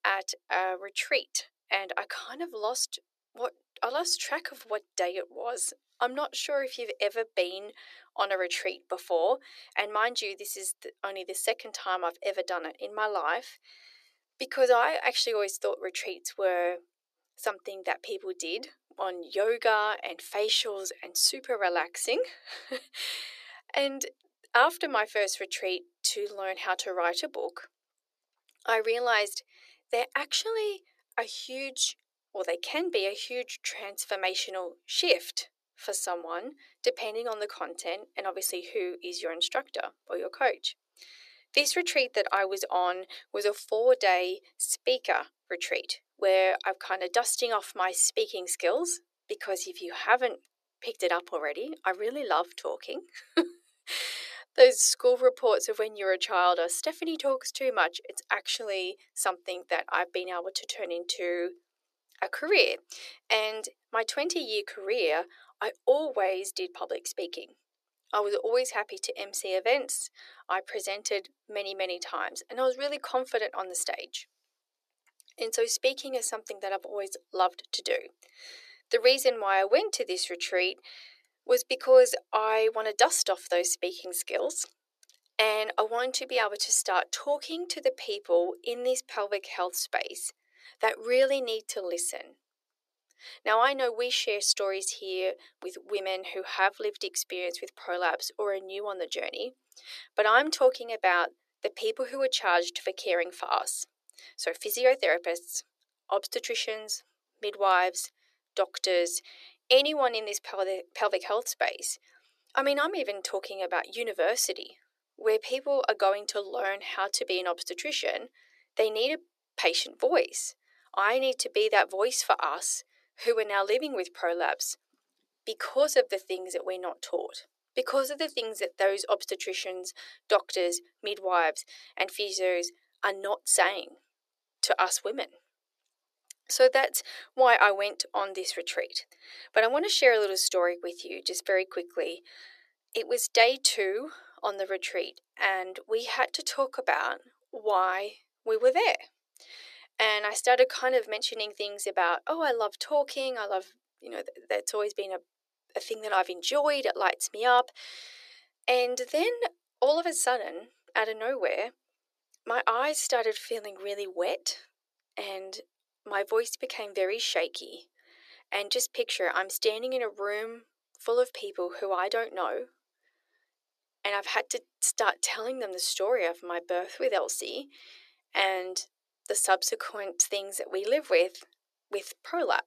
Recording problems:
thin; very; fading below 400 Hz

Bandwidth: 14 kHz